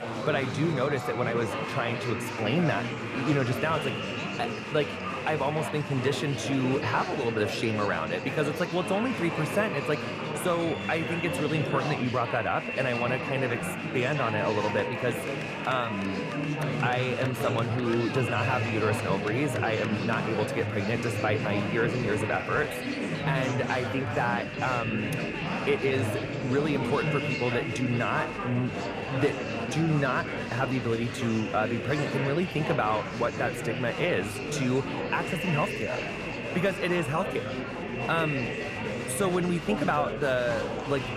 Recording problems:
echo of what is said; strong; throughout; 360 ms later, 9 dB below the speech
murmuring crowd; loud; throughout; 3 dB below the speech

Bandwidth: 14.5 kHz